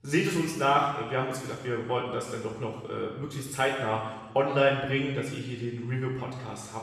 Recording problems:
off-mic speech; far
room echo; noticeable; dies away in 1.2 s

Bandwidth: 14.5 kHz